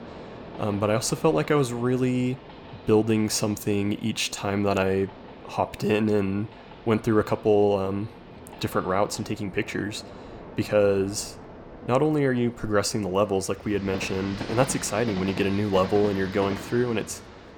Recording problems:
train or aircraft noise; noticeable; throughout; 15 dB below the speech

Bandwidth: 18.5 kHz